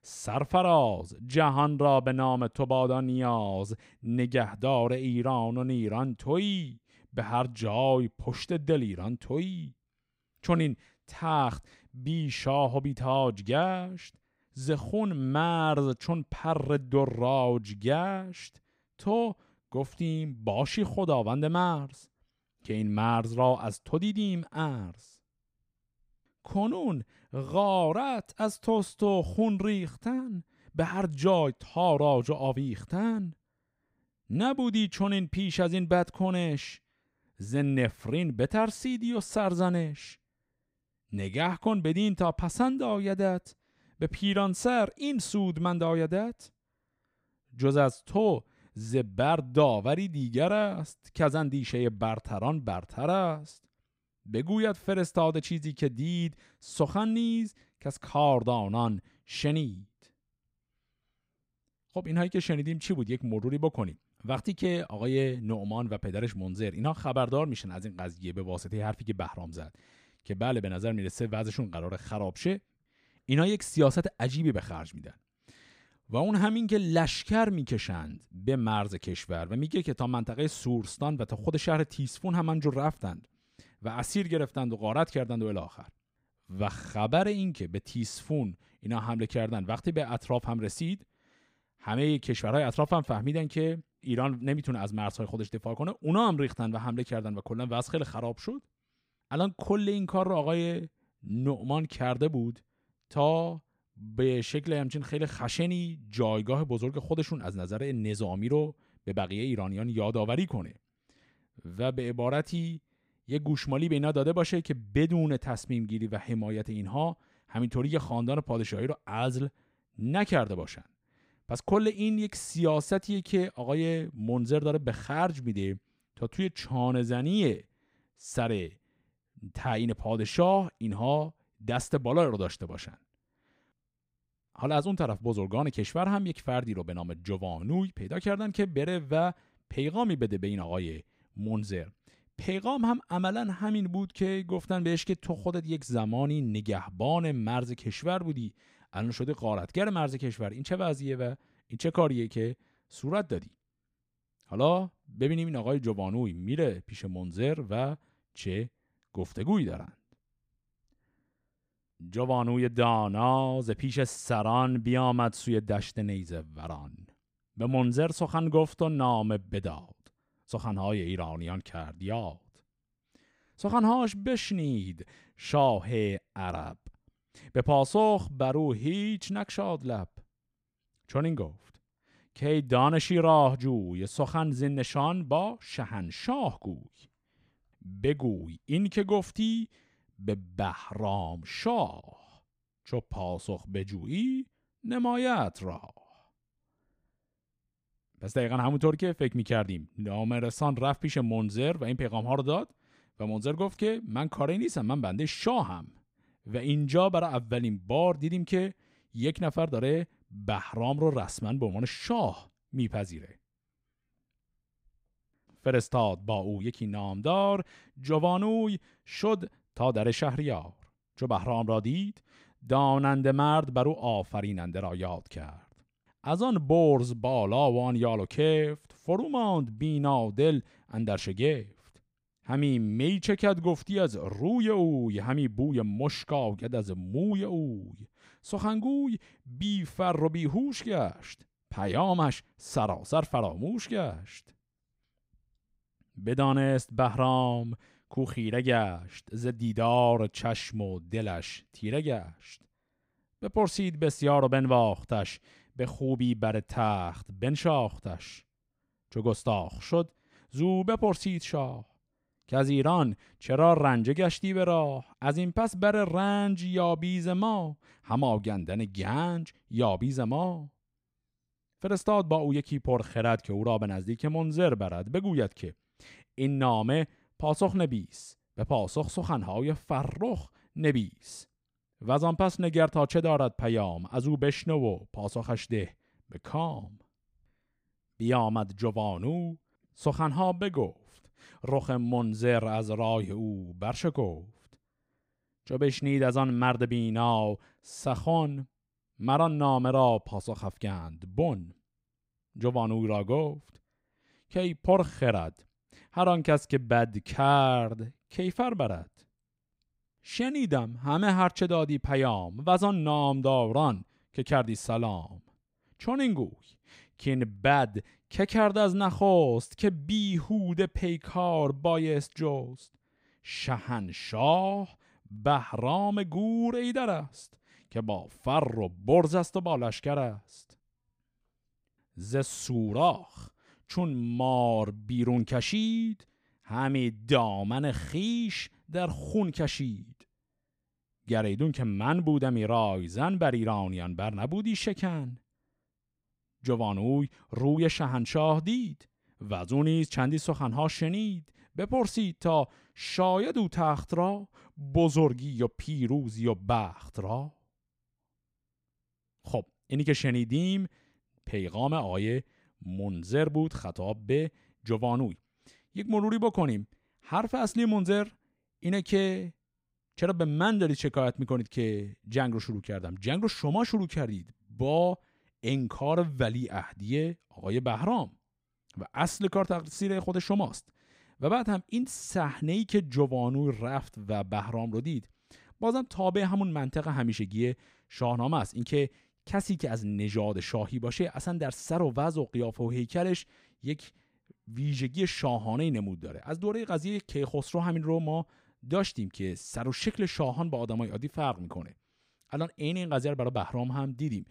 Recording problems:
none

